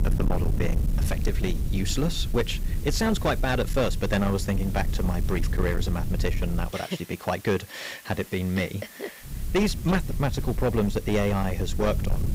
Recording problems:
distortion; slight; 11% of the sound clipped
hiss; noticeable; throughout; 20 dB below the speech
low rumble; noticeable; until 6.5 s and from 9.5 s on; 15 dB below the speech

